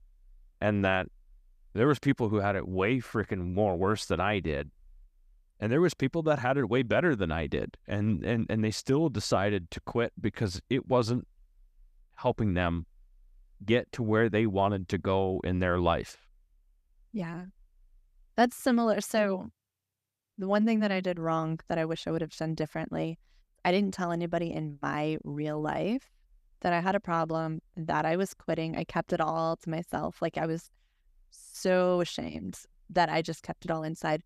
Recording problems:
none

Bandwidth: 14.5 kHz